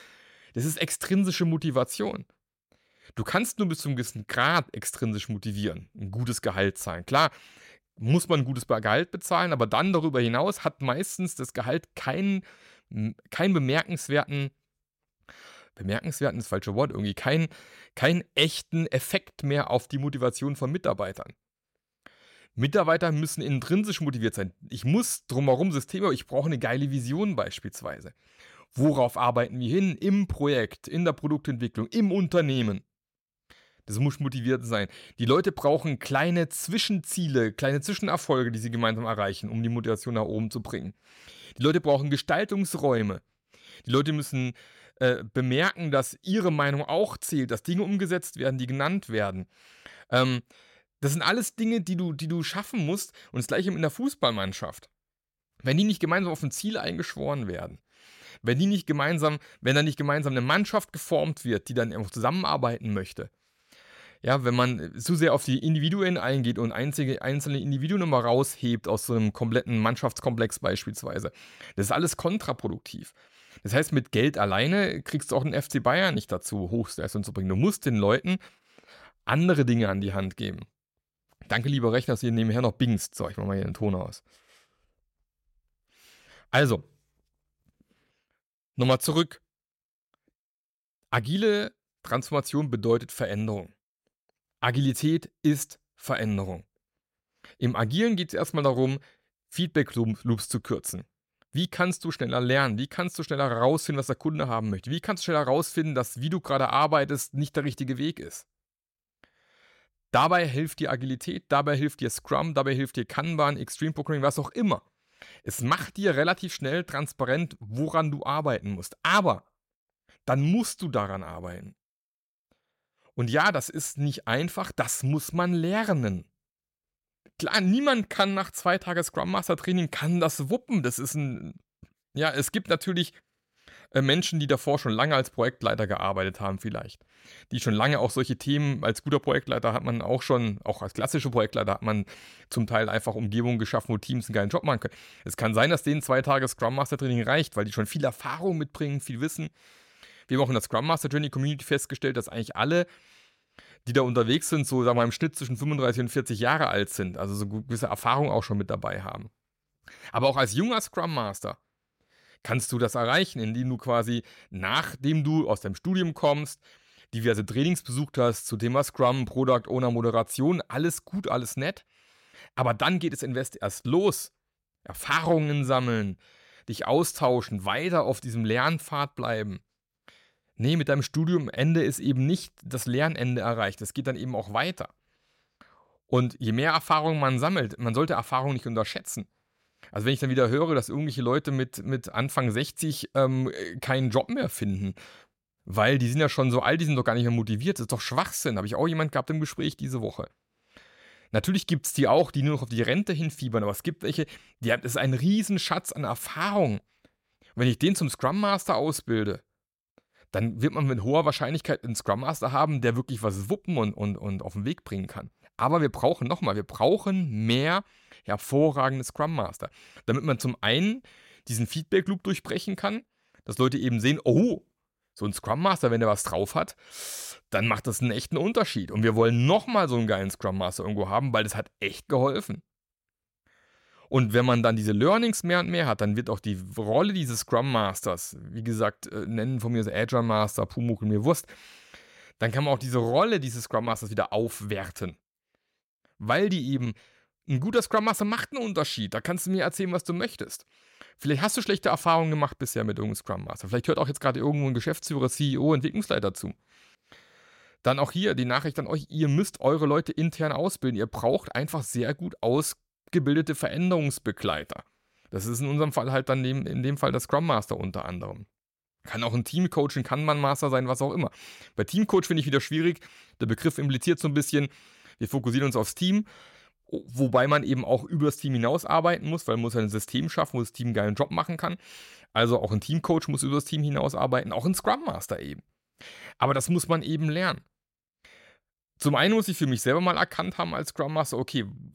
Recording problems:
none

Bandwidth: 16.5 kHz